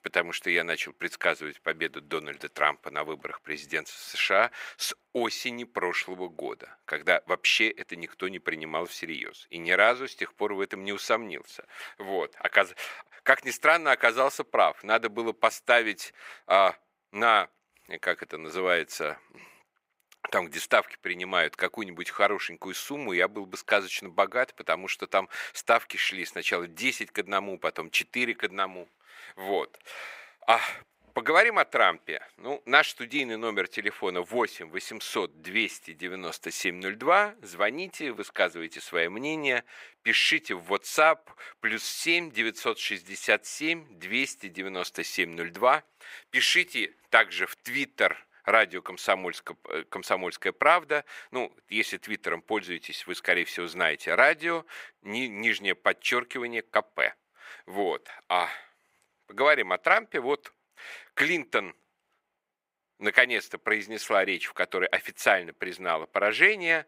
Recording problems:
thin; very; fading below 500 Hz

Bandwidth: 15.5 kHz